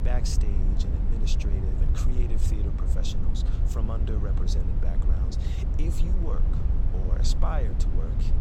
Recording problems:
low rumble; loud; throughout; 3 dB below the speech

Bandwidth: 16 kHz